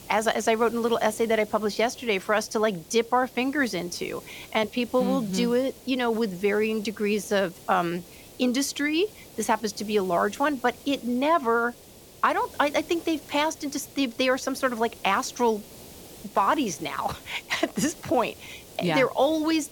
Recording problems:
hiss; noticeable; throughout; 20 dB below the speech

